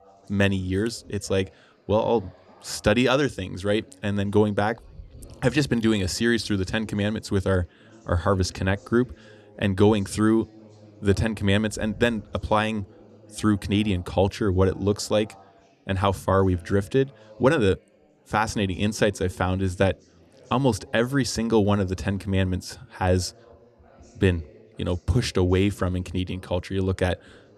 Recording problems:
background chatter; faint; throughout; 3 voices, 25 dB below the speech

